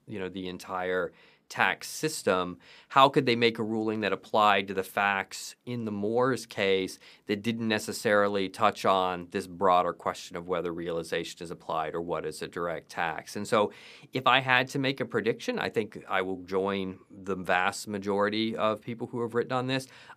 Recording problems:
none

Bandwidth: 15 kHz